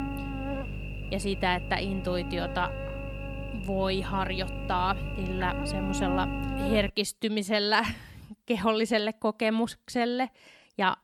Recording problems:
electrical hum; loud; until 7 s; 50 Hz, 9 dB below the speech

